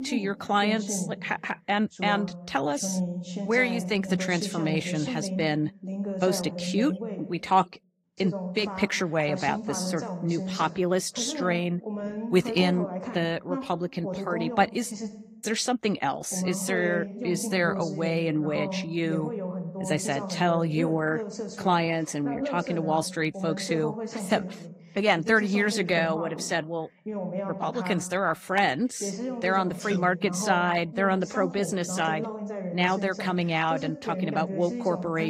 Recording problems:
garbled, watery; slightly; nothing above 15.5 kHz
voice in the background; loud; throughout; 7 dB below the speech
abrupt cut into speech; at the end

